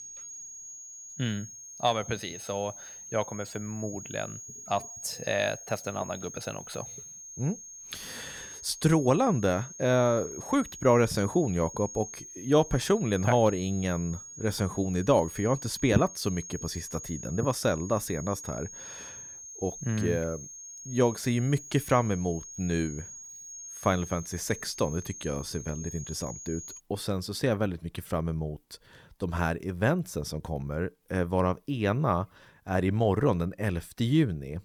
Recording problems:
high-pitched whine; noticeable; until 27 s; 6.5 kHz, 10 dB below the speech

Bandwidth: 18.5 kHz